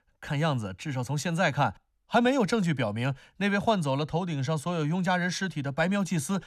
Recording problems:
none

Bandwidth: 13.5 kHz